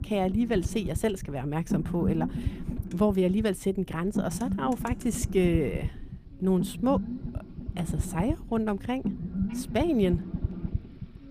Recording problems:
low rumble; noticeable; throughout; 10 dB below the speech
traffic noise; faint; throughout; 25 dB below the speech

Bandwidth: 15 kHz